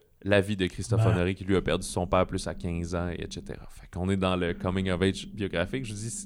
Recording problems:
low rumble; faint; from 1.5 to 3.5 s and from 4.5 s on; 25 dB below the speech

